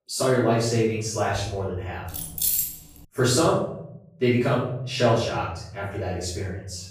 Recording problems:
off-mic speech; far
room echo; noticeable; dies away in 1 s
jangling keys; loud; at 2 s; peak 3 dB above the speech

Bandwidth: 15 kHz